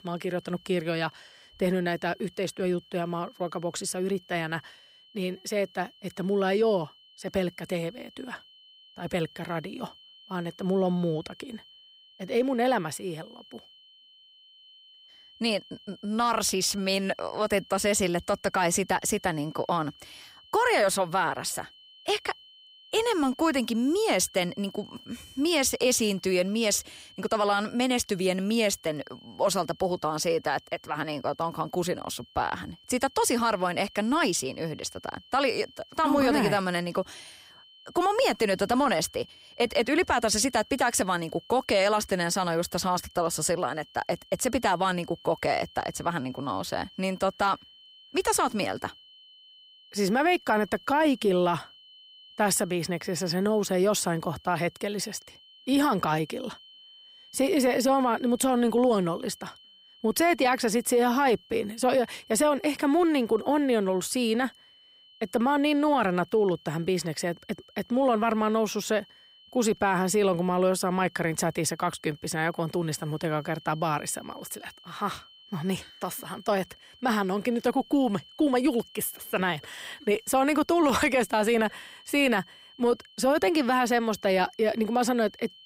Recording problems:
high-pitched whine; faint; throughout; 3 kHz, 25 dB below the speech

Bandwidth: 15.5 kHz